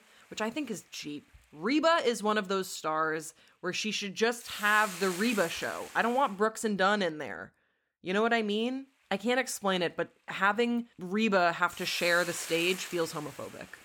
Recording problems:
hiss; noticeable; until 6.5 s and from 9 s on; 10 dB below the speech

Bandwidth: 18 kHz